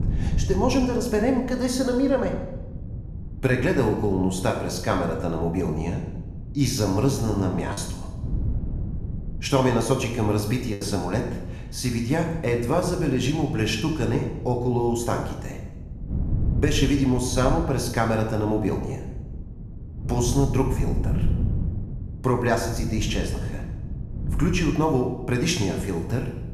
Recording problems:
room echo; noticeable; dies away in 0.8 s
off-mic speech; somewhat distant
wind noise on the microphone; occasional gusts; 20 dB below the speech
choppy; occasionally; from 7.5 to 11 s; 4% of the speech affected

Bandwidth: 14.5 kHz